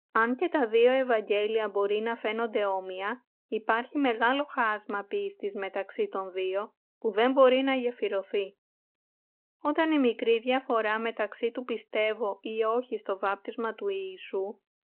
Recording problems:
phone-call audio

